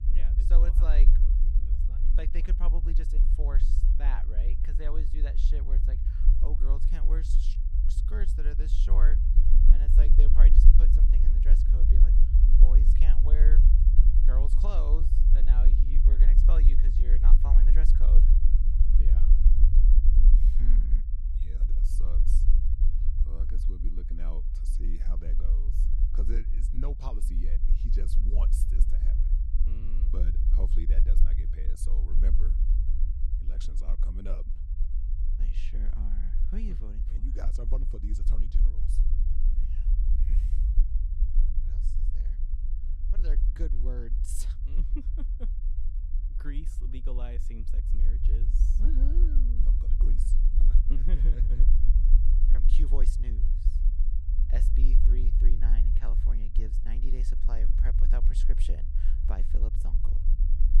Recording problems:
low rumble; loud; throughout; 2 dB below the speech

